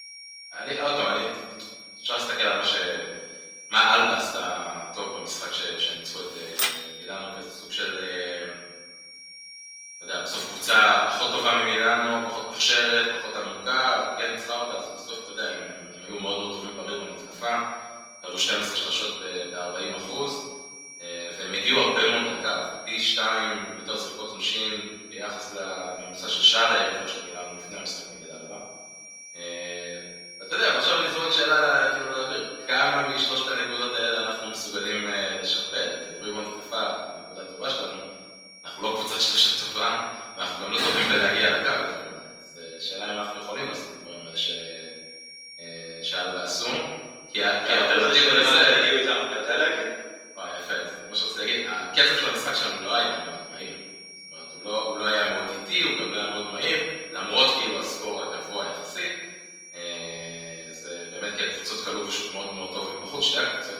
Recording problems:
off-mic speech; far
room echo; noticeable; dies away in 1.2 s
thin; somewhat; fading below 450 Hz
garbled, watery; slightly
high-pitched whine; noticeable; throughout; 5.5 kHz, 15 dB below the speech
keyboard typing; noticeable; at 6.5 s; peak 2 dB below the speech
door banging; noticeable; at 41 s; peak 4 dB below the speech

